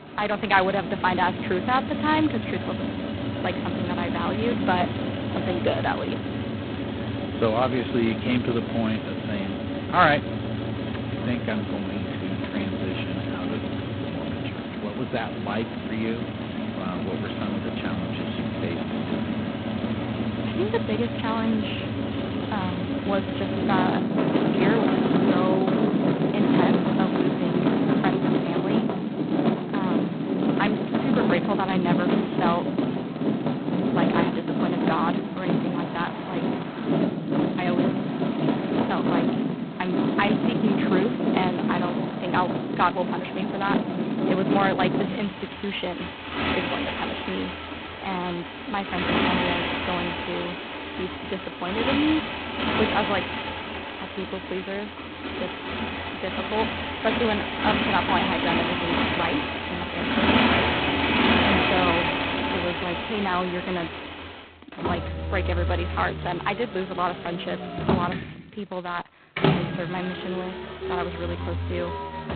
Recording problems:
phone-call audio; poor line; nothing above 4 kHz
traffic noise; very loud; throughout; 2 dB above the speech

